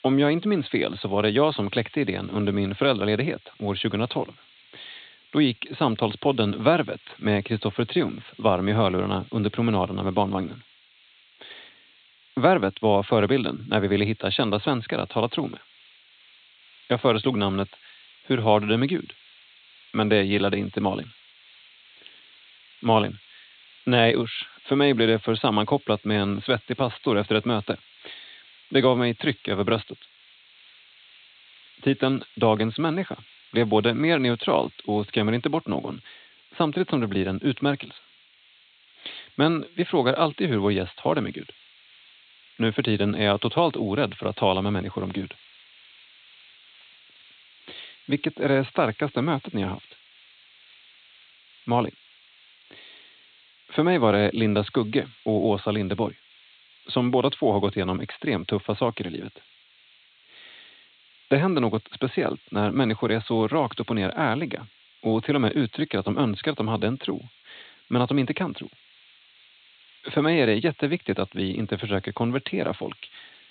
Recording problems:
high frequencies cut off; severe; nothing above 4 kHz
hiss; faint; throughout; 25 dB below the speech

